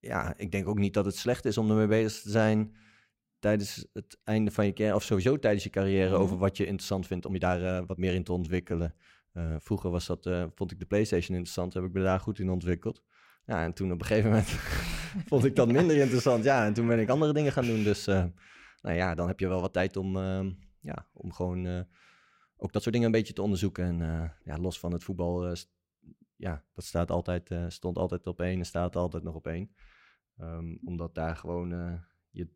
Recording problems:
uneven, jittery; strongly; from 2 to 31 s

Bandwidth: 16 kHz